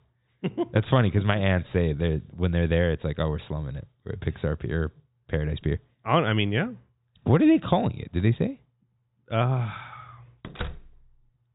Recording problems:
high frequencies cut off; severe; nothing above 4 kHz
door banging; faint; at 10 s; peak 10 dB below the speech

